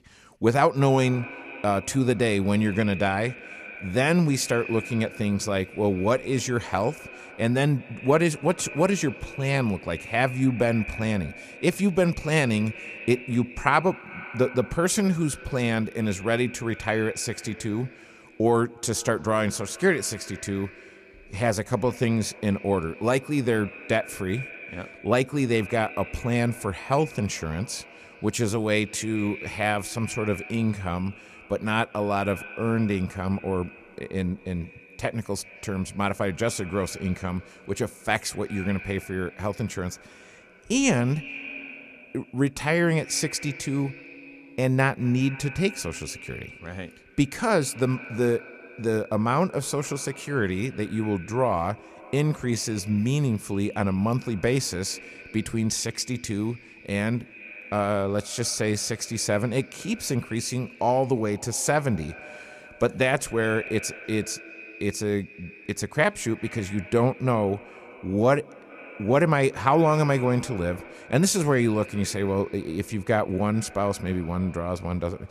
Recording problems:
echo of what is said; noticeable; throughout; 190 ms later, 15 dB below the speech

